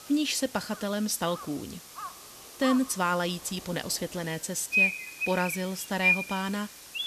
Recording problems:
animal sounds; very loud; throughout; 2 dB above the speech
hiss; noticeable; throughout; 15 dB below the speech
crowd noise; faint; throughout; 30 dB below the speech

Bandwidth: 14 kHz